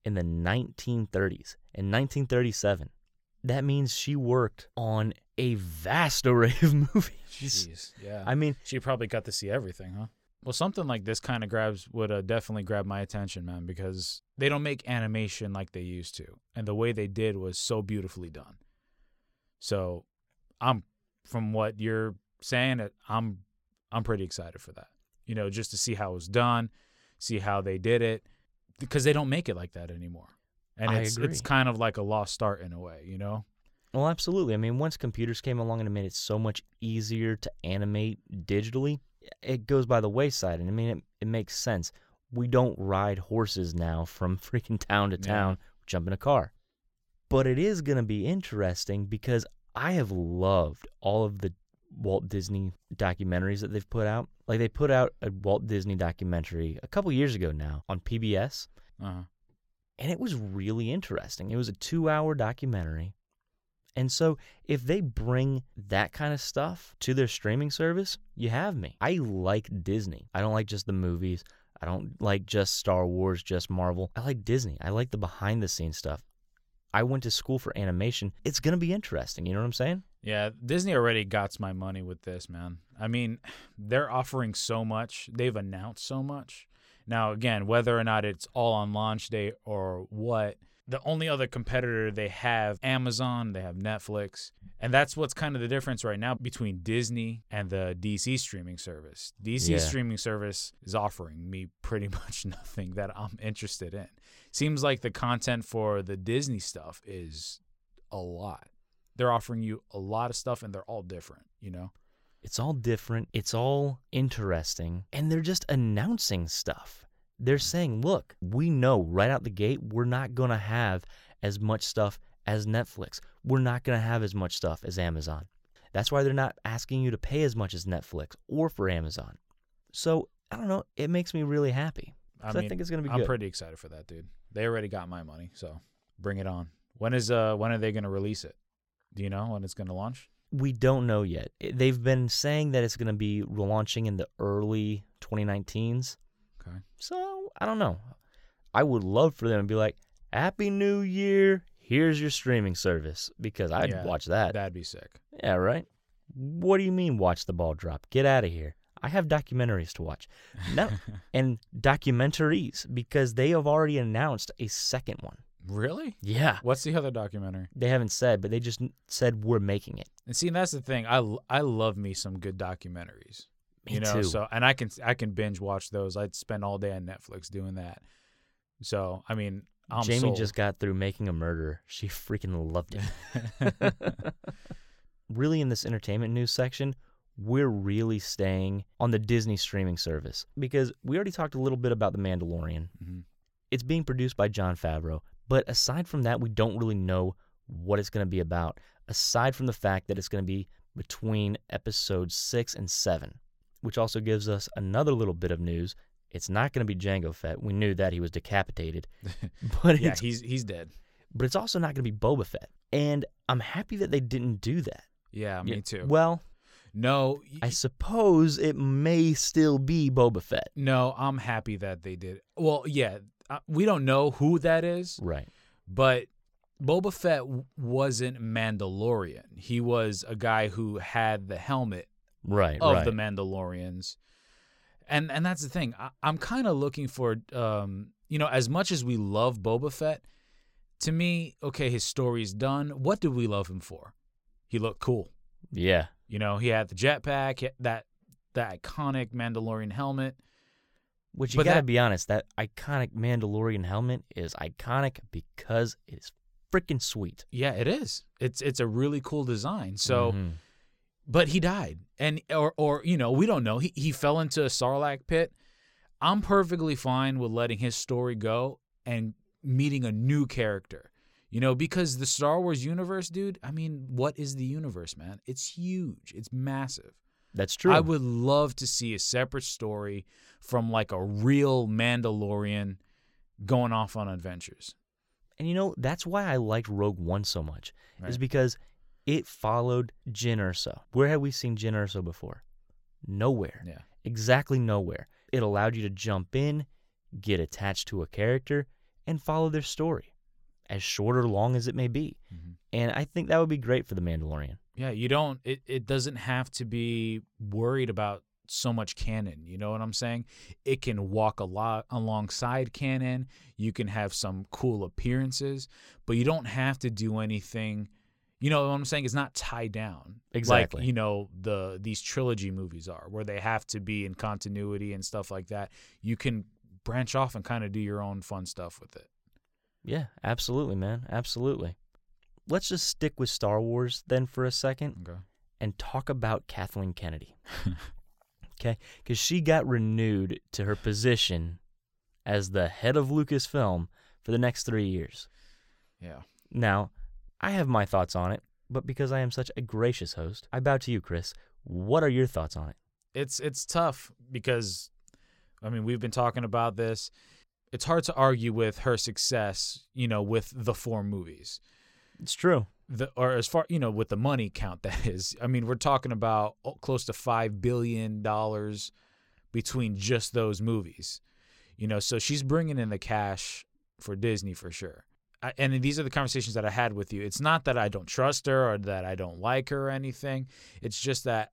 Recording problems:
none

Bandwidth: 16.5 kHz